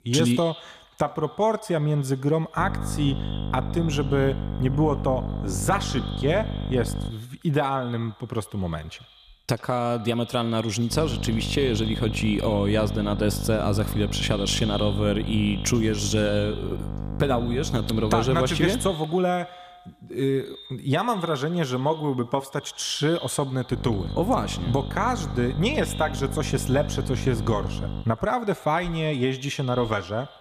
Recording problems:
echo of what is said; noticeable; throughout; 80 ms later, 15 dB below the speech
electrical hum; noticeable; from 2.5 to 7 s, from 11 to 19 s and from 24 to 28 s; 50 Hz, 15 dB below the speech

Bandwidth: 14.5 kHz